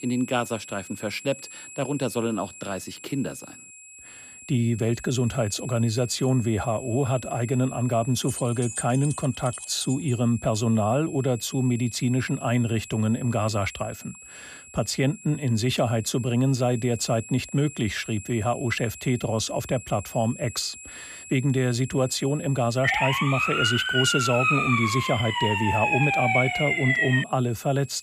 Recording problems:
high-pitched whine; noticeable; throughout; 7.5 kHz, 15 dB below the speech
jangling keys; noticeable; from 8.5 to 10 s; peak 6 dB below the speech
siren; loud; from 23 to 27 s; peak 4 dB above the speech

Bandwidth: 14.5 kHz